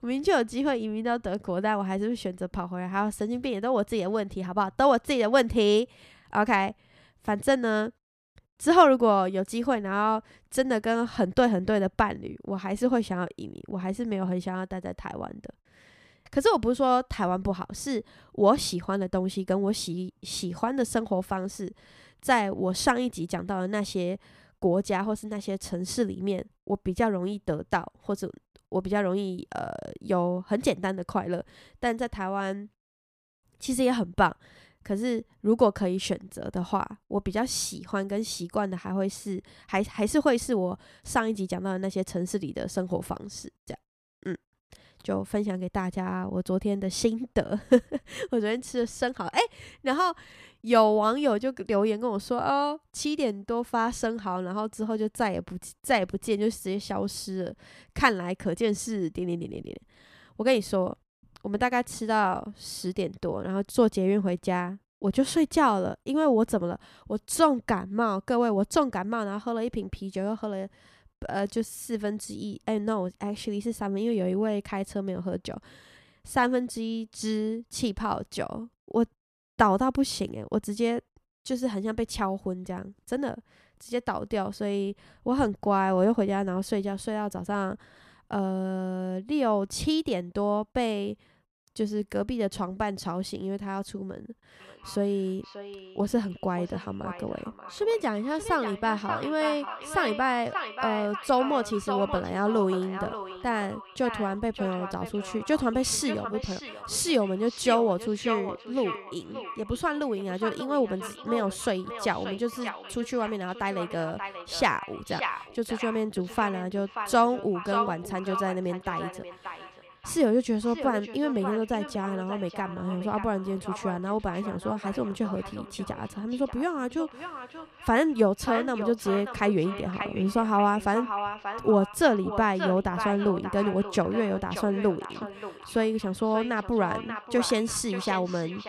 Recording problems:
echo of what is said; strong; from 1:35 on; 580 ms later, 10 dB below the speech

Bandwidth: 14 kHz